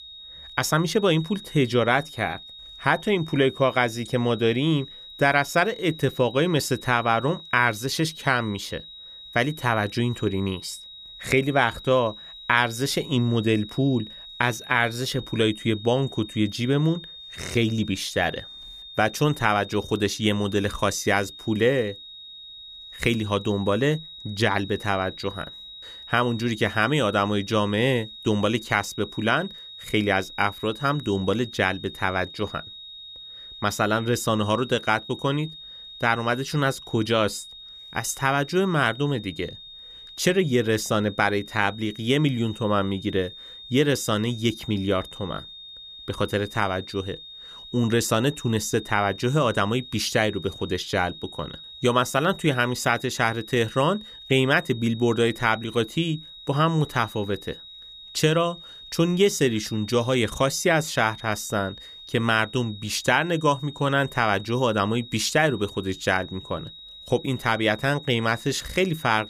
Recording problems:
high-pitched whine; noticeable; throughout; 4 kHz, 15 dB below the speech

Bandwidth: 15 kHz